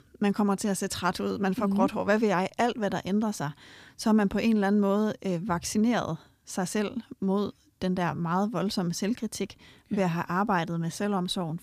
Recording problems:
none

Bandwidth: 15 kHz